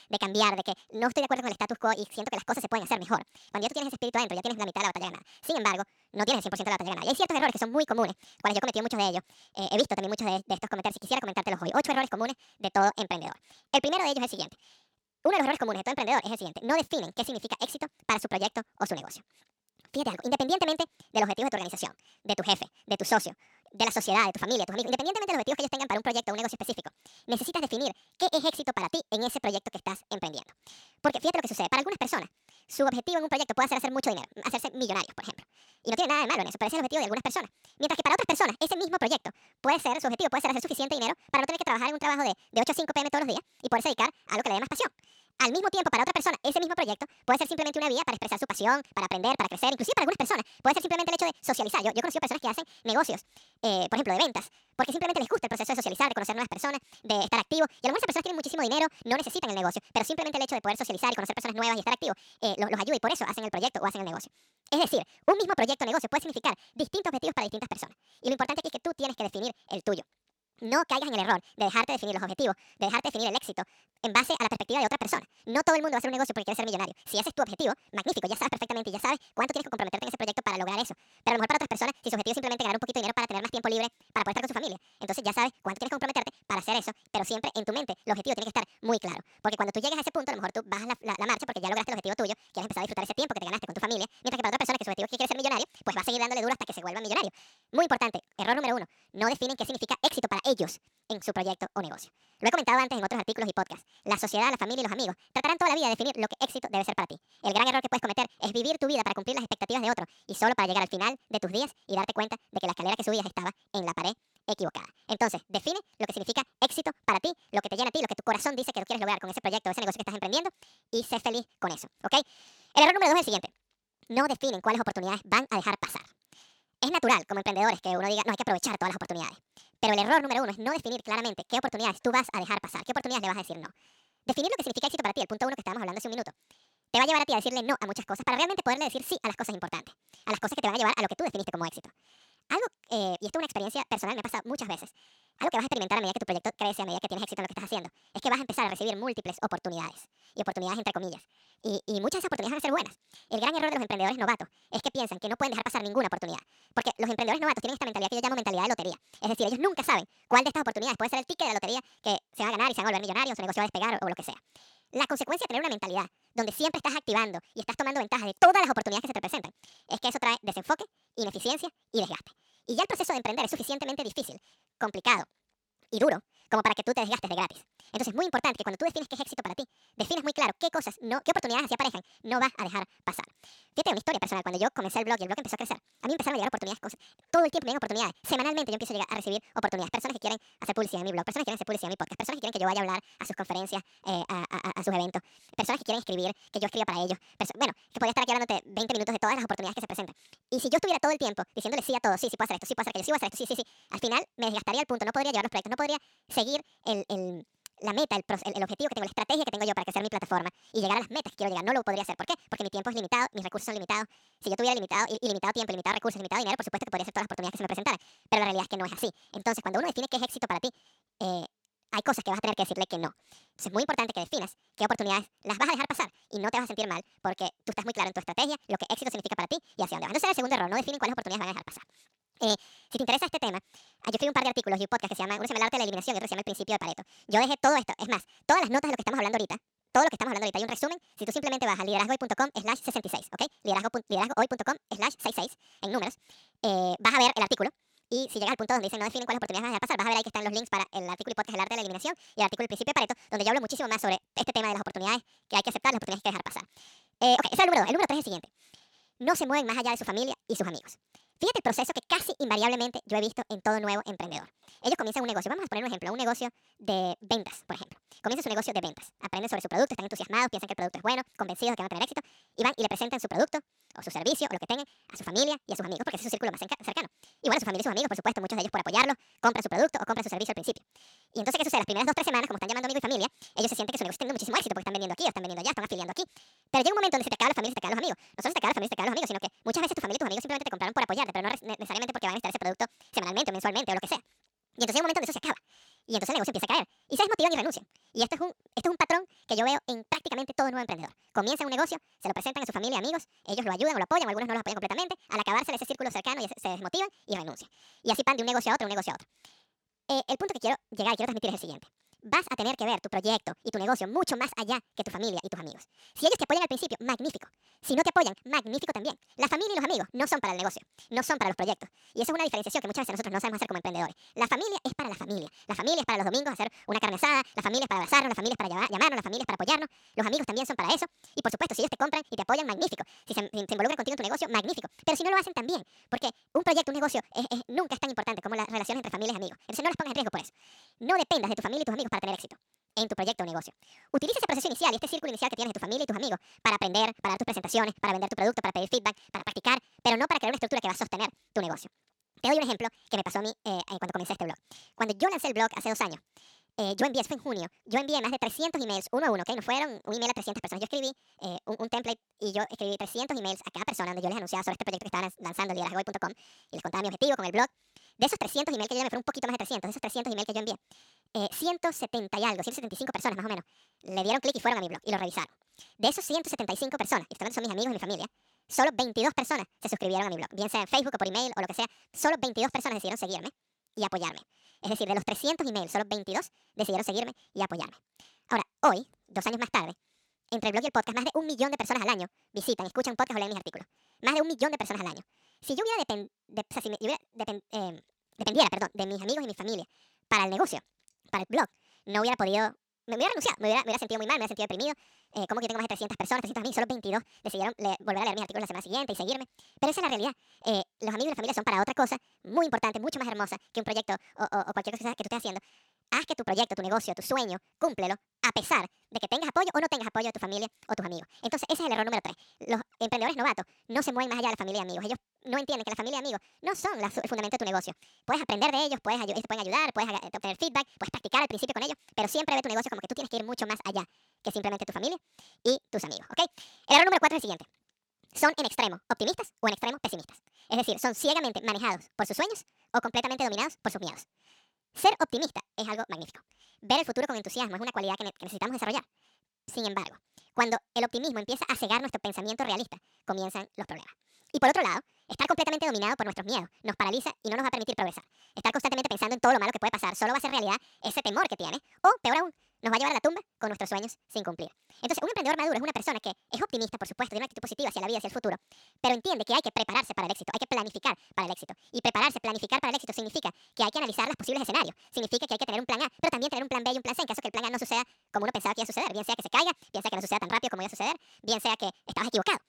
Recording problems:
wrong speed and pitch; too fast and too high; 1.7 times normal speed

